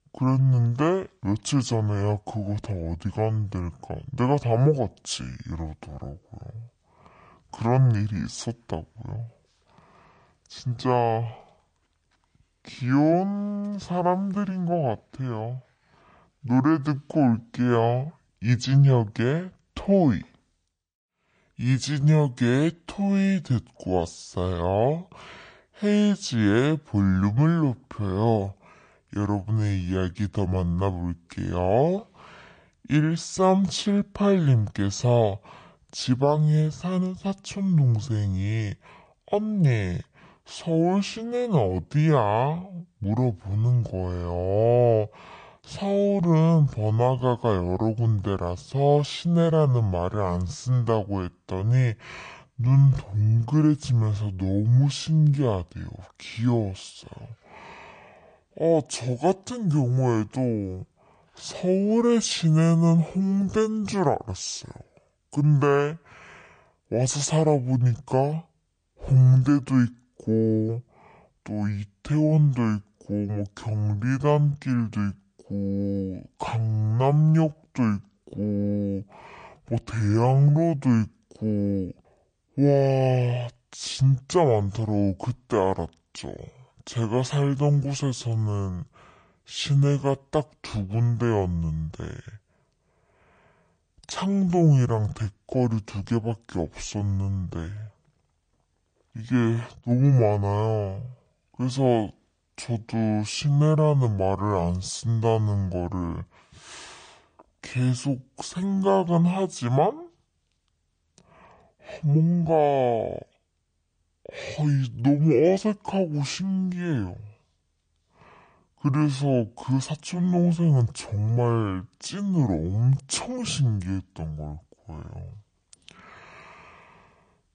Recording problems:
wrong speed and pitch; too slow and too low; 0.6 times normal speed

